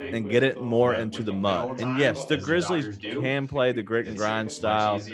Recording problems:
background chatter; loud; throughout; 2 voices, 10 dB below the speech

